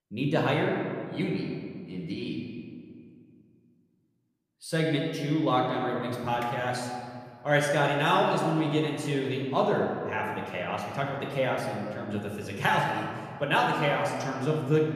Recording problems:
room echo; noticeable; dies away in 1.8 s
off-mic speech; somewhat distant

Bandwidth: 14.5 kHz